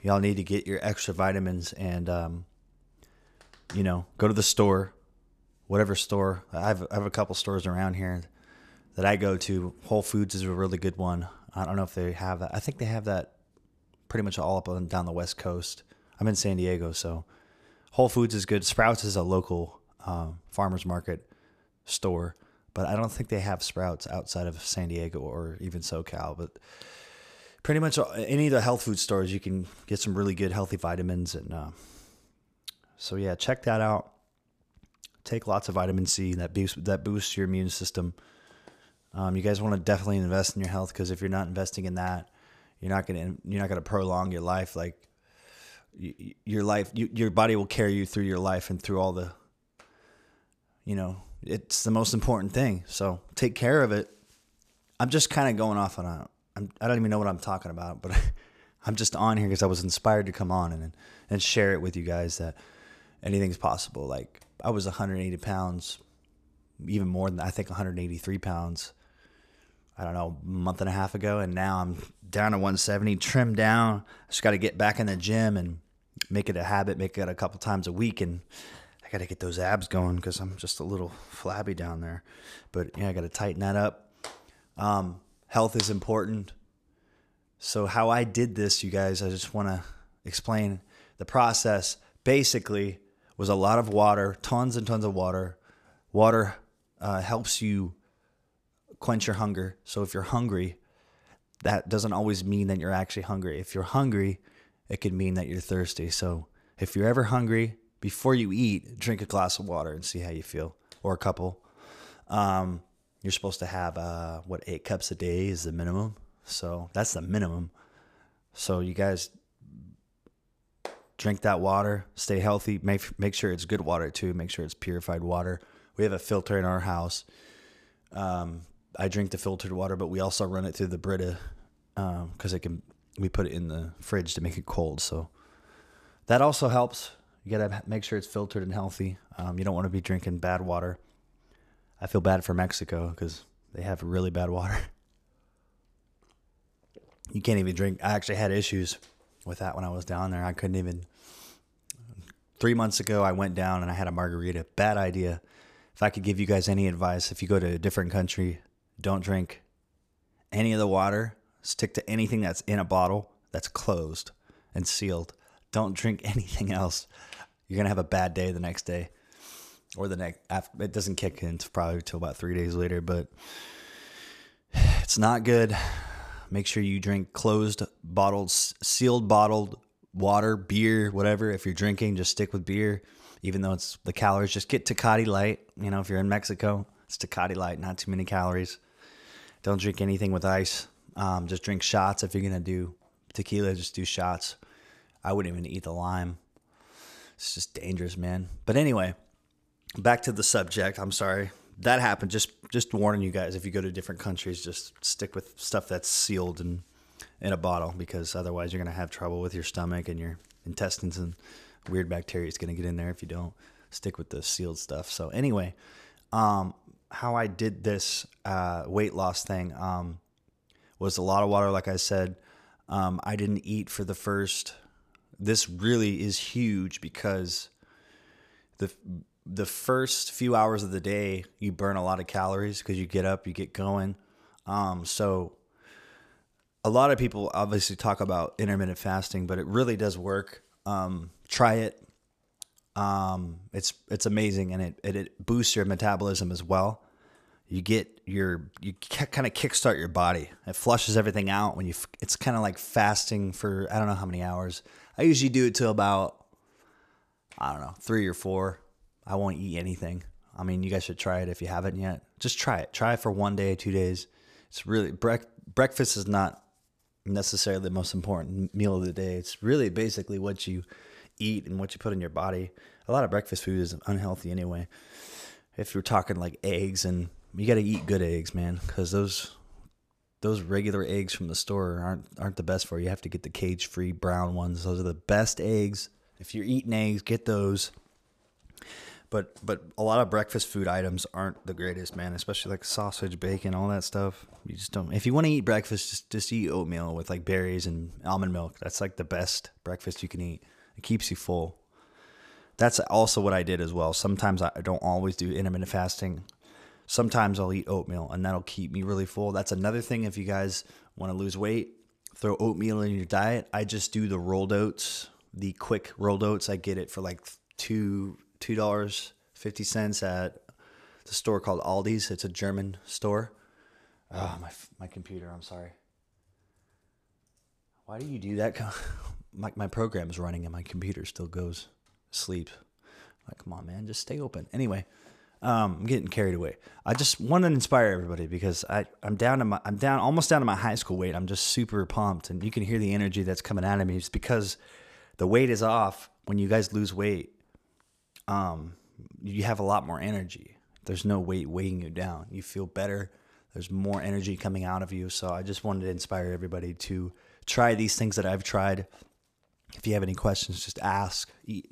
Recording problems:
none

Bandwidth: 14.5 kHz